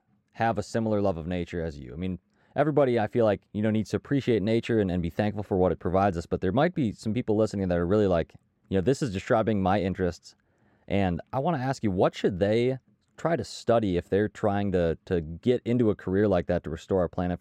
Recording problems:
muffled; slightly; fading above 2 kHz

